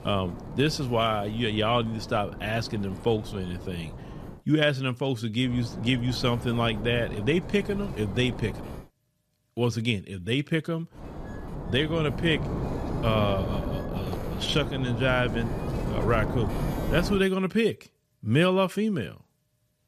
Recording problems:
wind noise on the microphone; occasional gusts; until 4.5 s, from 5.5 to 9 s and from 11 to 17 s; 10 dB below the speech

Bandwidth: 14.5 kHz